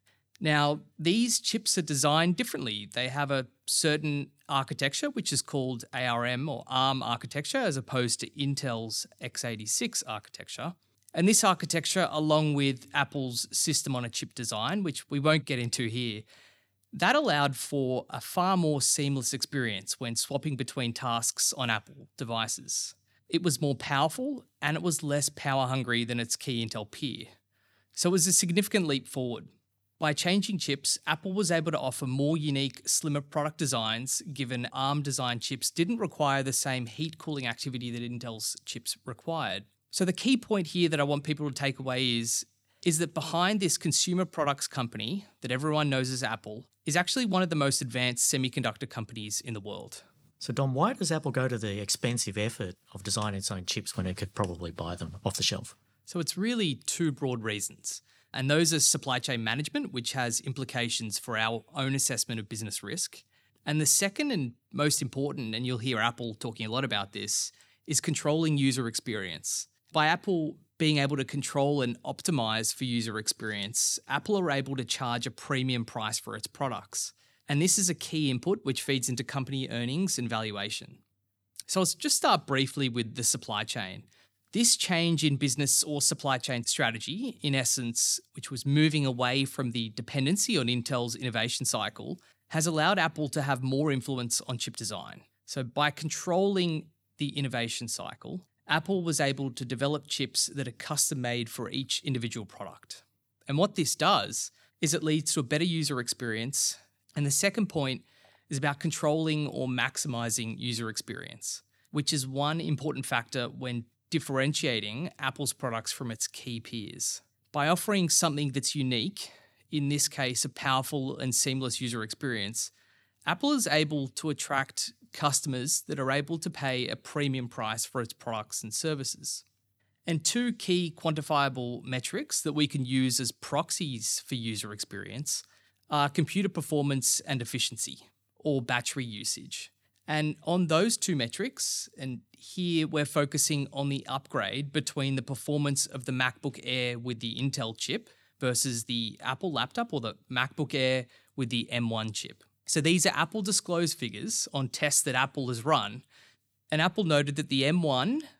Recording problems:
none

